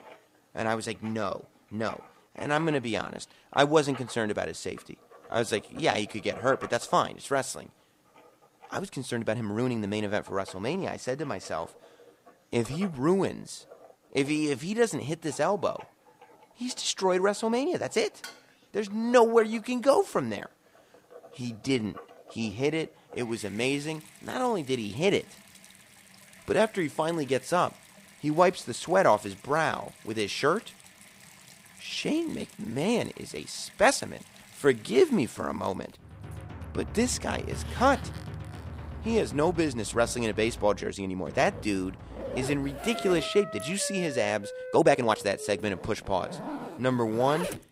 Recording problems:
household noises; noticeable; throughout; 20 dB below the speech
background music; noticeable; from 36 s on; 15 dB below the speech
uneven, jittery; strongly; from 1 to 45 s
clattering dishes; faint; at 18 s; peak 15 dB below the speech

